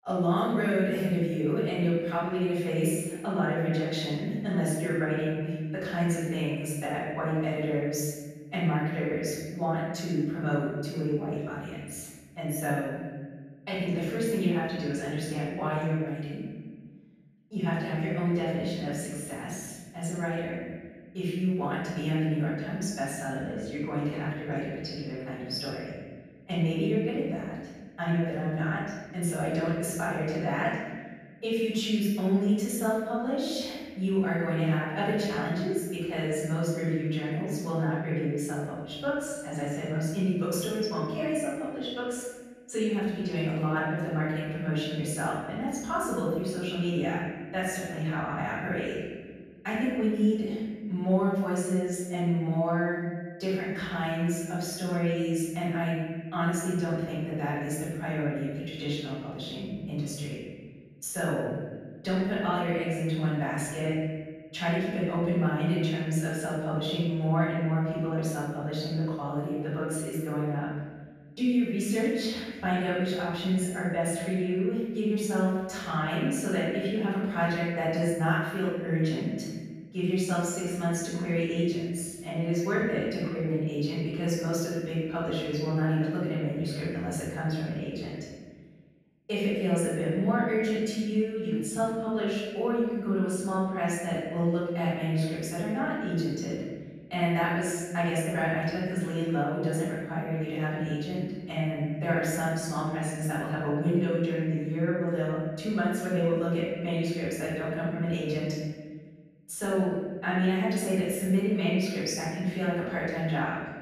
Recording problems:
room echo; strong; dies away in 1.5 s
off-mic speech; far

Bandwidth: 14 kHz